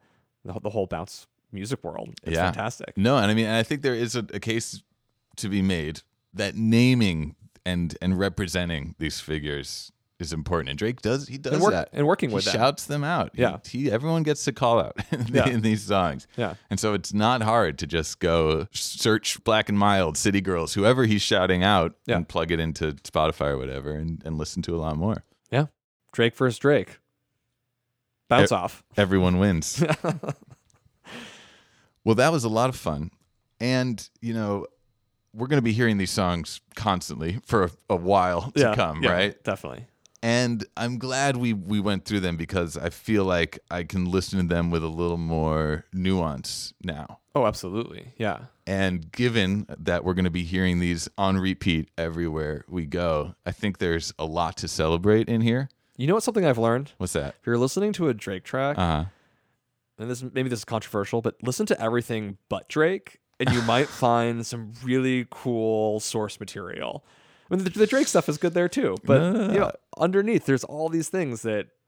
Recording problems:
none

